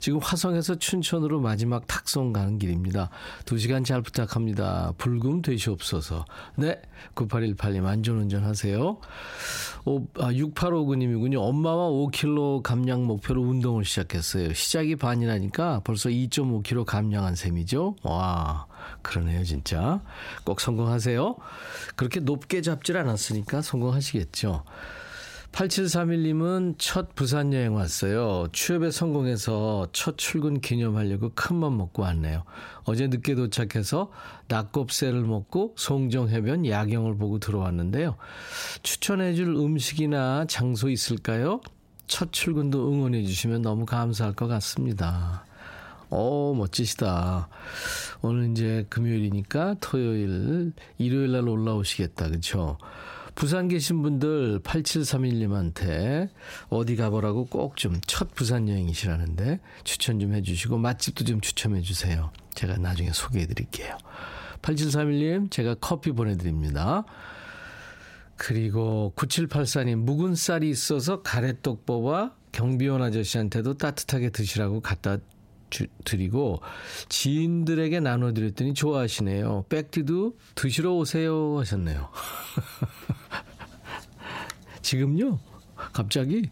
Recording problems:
squashed, flat; heavily

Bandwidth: 16 kHz